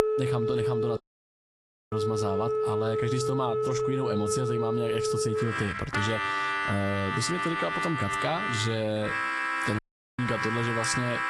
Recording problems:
garbled, watery; slightly; nothing above 11 kHz
squashed, flat; somewhat
background music; very loud; throughout; 1 dB above the speech
audio cutting out; at 1 s for 1 s and at 10 s

